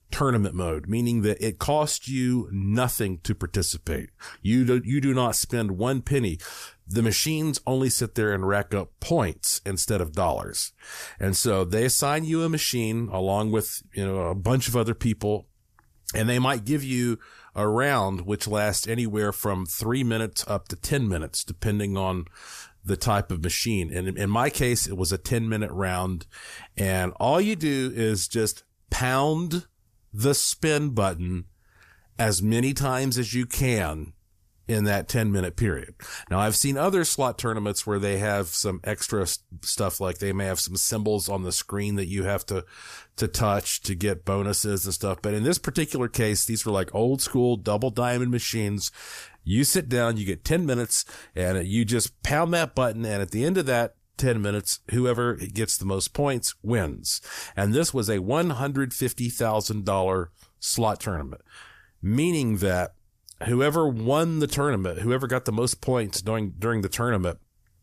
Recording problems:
none

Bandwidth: 14.5 kHz